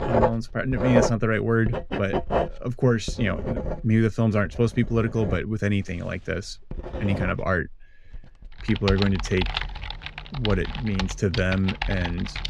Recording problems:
household noises; loud; throughout; 5 dB below the speech

